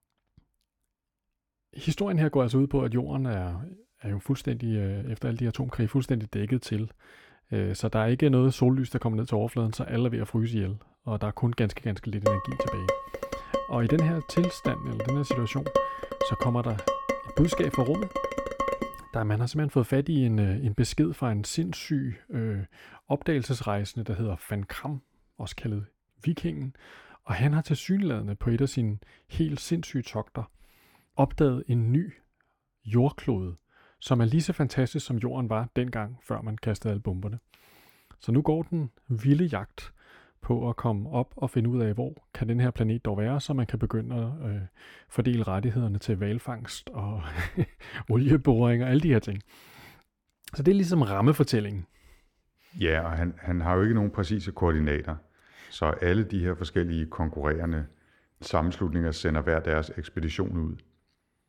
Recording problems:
muffled; slightly; fading above 3 kHz
clattering dishes; loud; from 12 to 19 s; peak level with the speech

